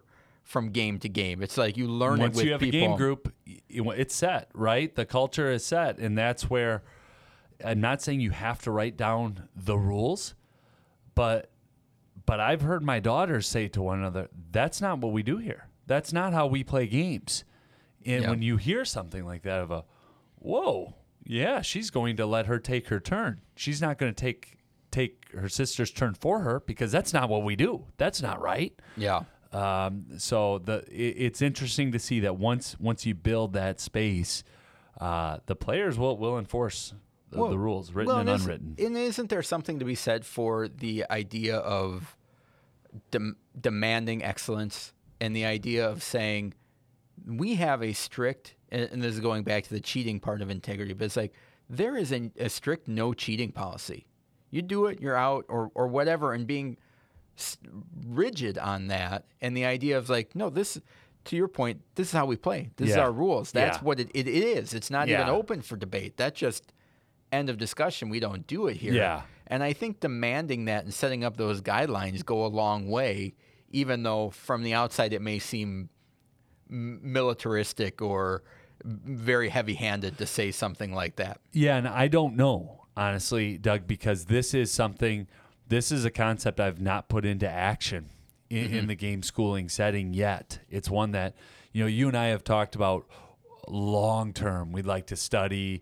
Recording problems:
none

